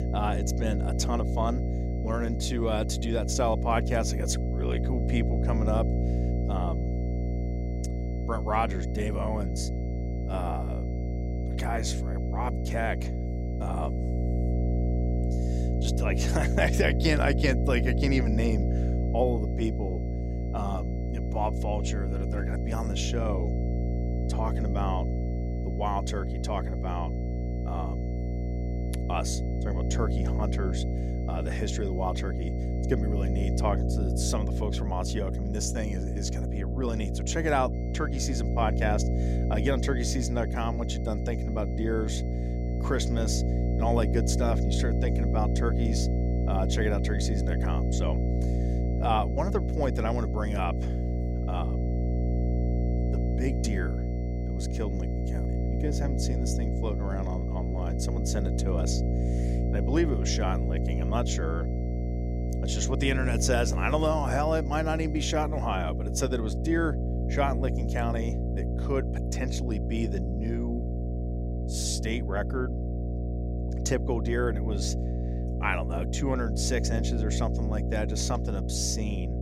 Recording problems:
electrical hum; loud; throughout; 60 Hz, 6 dB below the speech
high-pitched whine; faint; until 34 s and from 38 s to 1:05; 2 kHz, 25 dB below the speech

